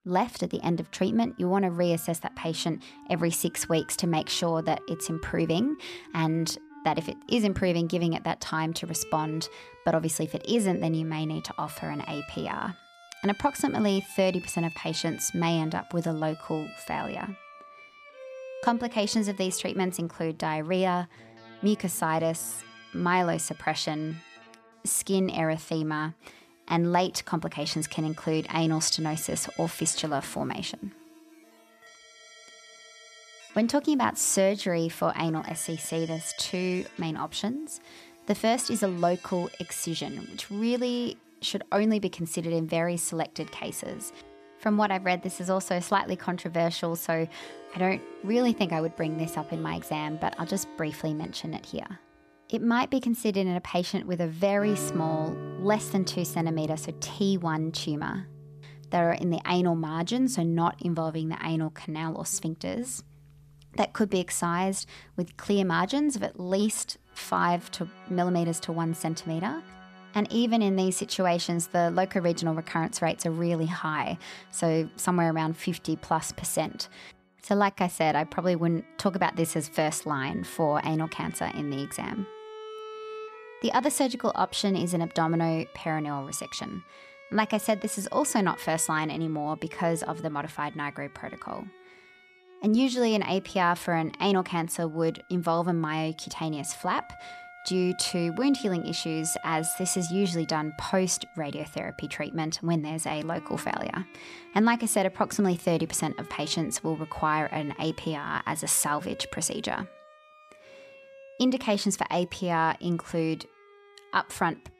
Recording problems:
background music; noticeable; throughout; 20 dB below the speech

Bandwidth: 14.5 kHz